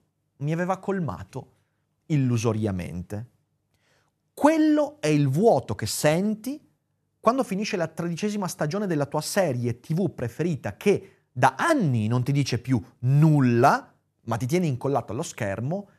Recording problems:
none

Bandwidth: 13.5 kHz